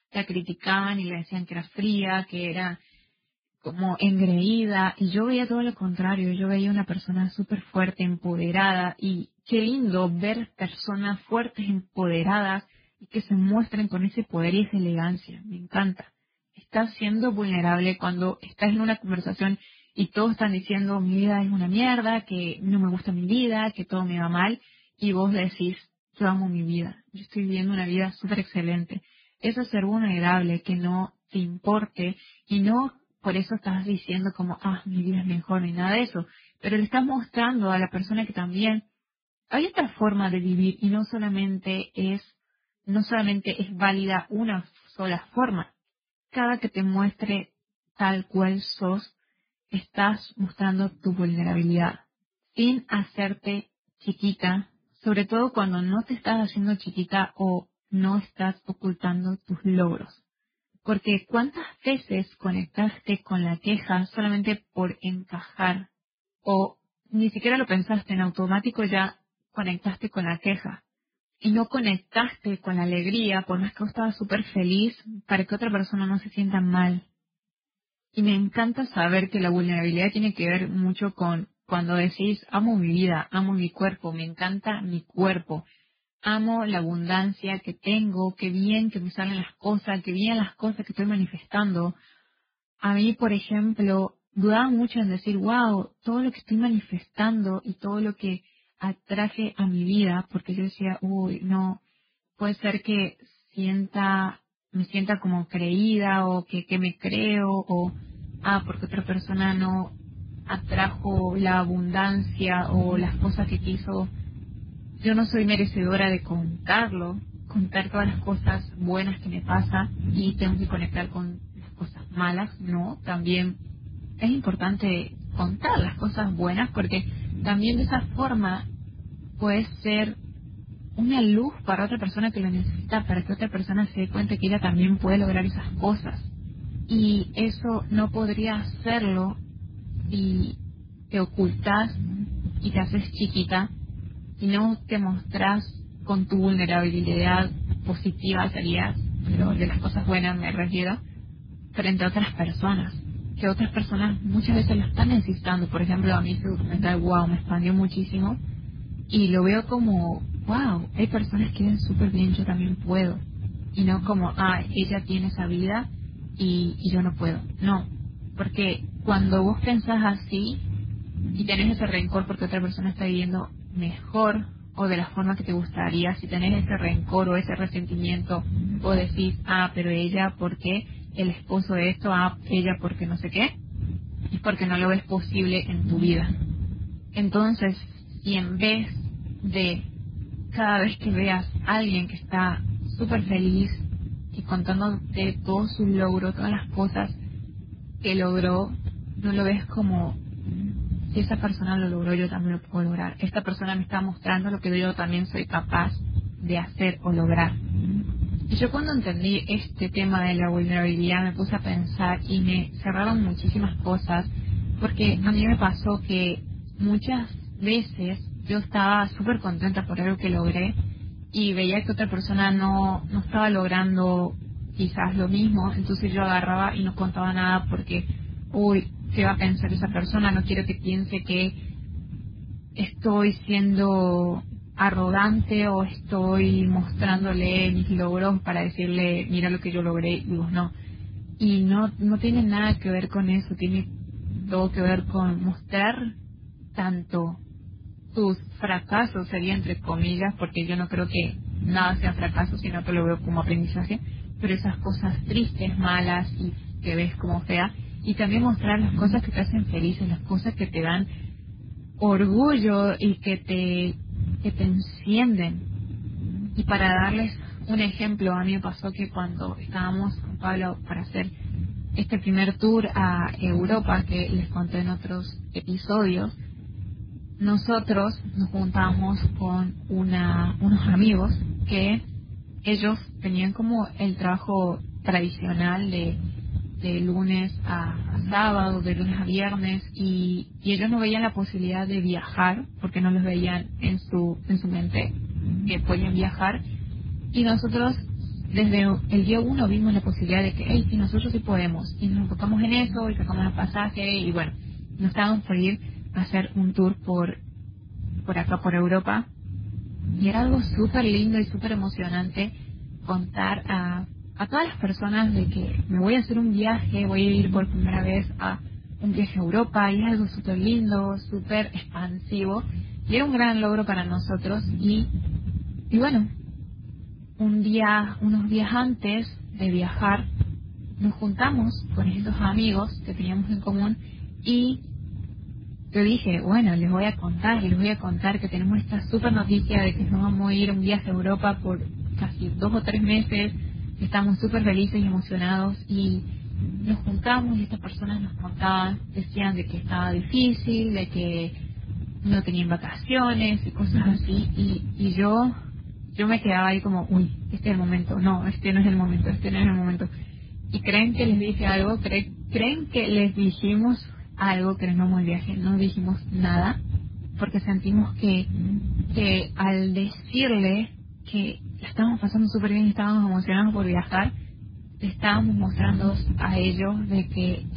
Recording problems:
garbled, watery; badly; nothing above 4 kHz
low rumble; noticeable; from 1:48 on; 15 dB below the speech

